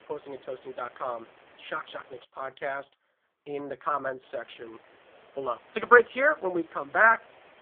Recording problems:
phone-call audio; poor line; nothing above 3.5 kHz
hiss; faint; until 2 s and from 4 s on; 30 dB below the speech

